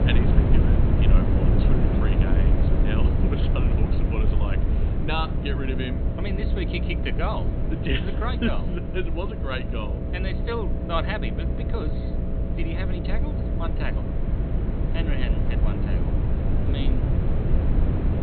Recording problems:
high frequencies cut off; severe; nothing above 4 kHz
electrical hum; loud; throughout; 60 Hz, 7 dB below the speech
low rumble; loud; throughout; 3 dB below the speech
traffic noise; very faint; until 4 s; 45 dB below the speech

